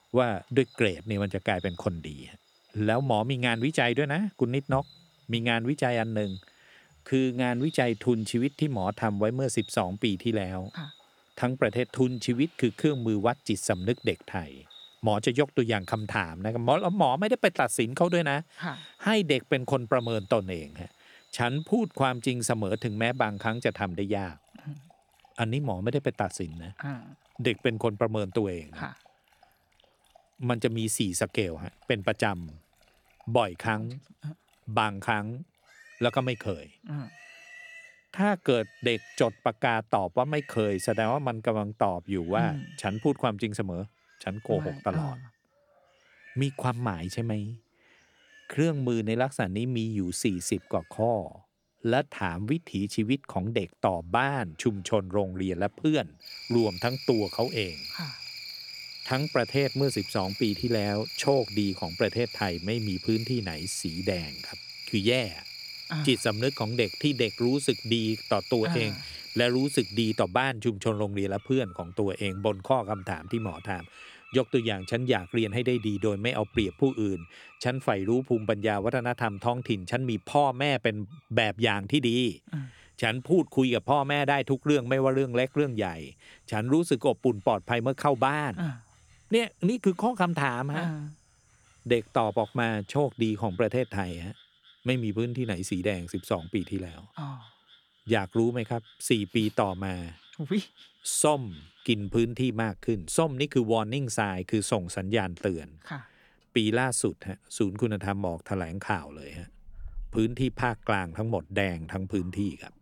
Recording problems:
animal sounds; noticeable; throughout; 15 dB below the speech

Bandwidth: 18 kHz